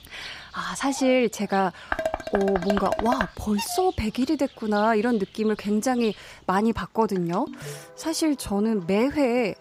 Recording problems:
animal sounds; noticeable; throughout; 20 dB below the speech
clattering dishes; noticeable; from 2 to 3.5 s; peak 3 dB below the speech
phone ringing; faint; at 7.5 s; peak 15 dB below the speech

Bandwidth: 15.5 kHz